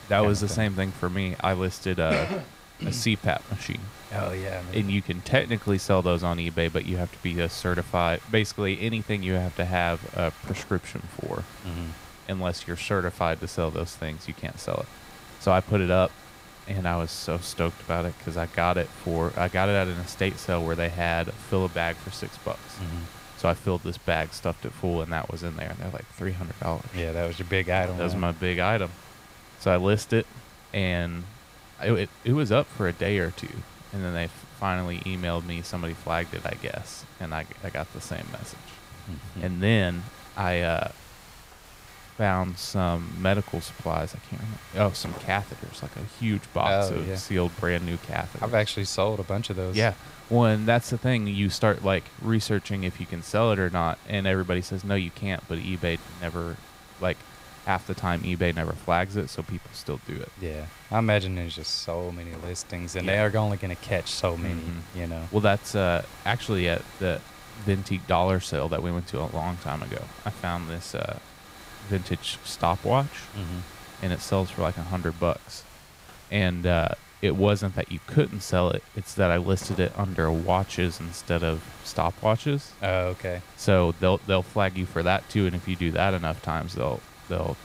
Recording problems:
hiss; noticeable; throughout; 20 dB below the speech

